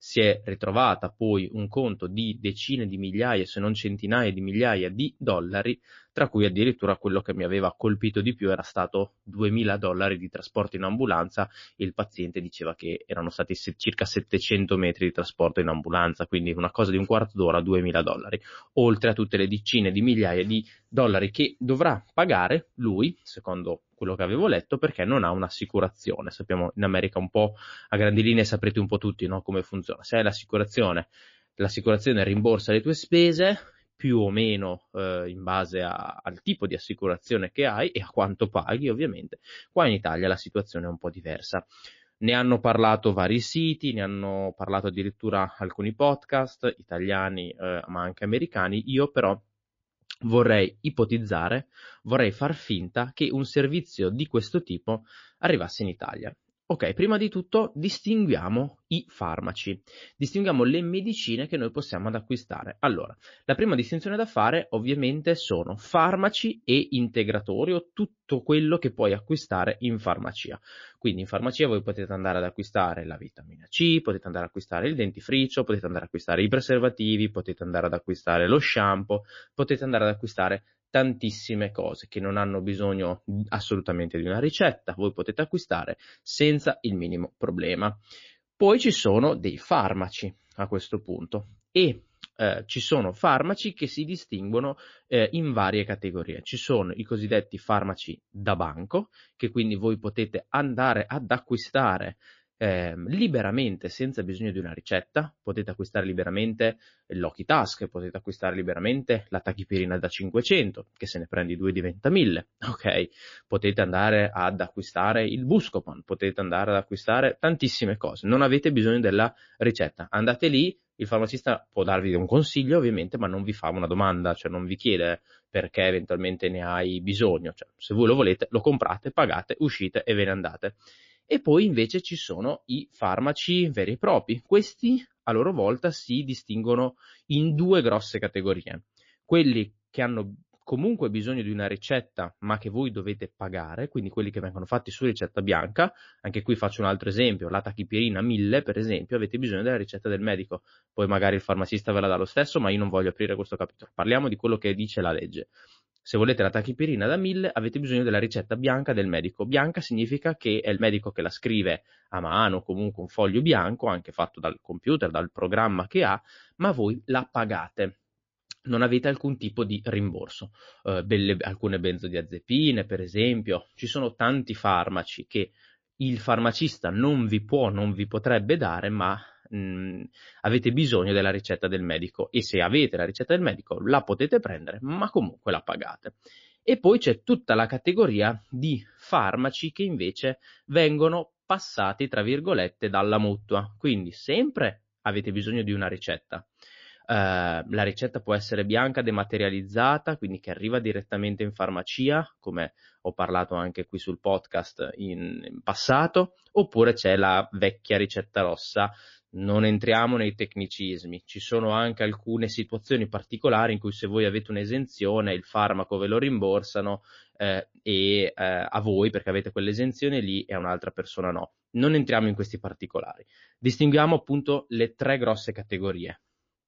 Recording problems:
garbled, watery; slightly; nothing above 6 kHz

